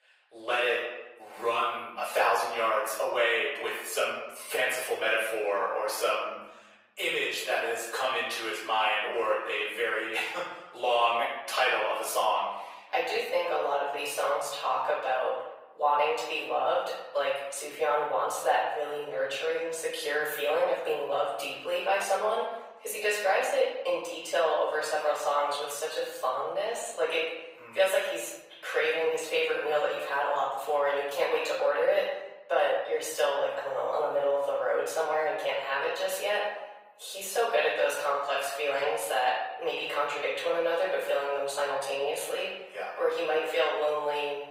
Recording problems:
off-mic speech; far
thin; very; fading below 550 Hz
room echo; noticeable; dies away in 0.9 s
garbled, watery; slightly; nothing above 15.5 kHz

